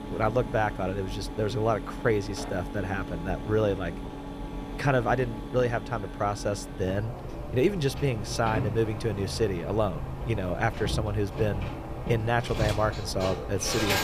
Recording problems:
machinery noise; loud; throughout; 7 dB below the speech
background music; faint; until 7 s; 25 dB below the speech

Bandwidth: 14.5 kHz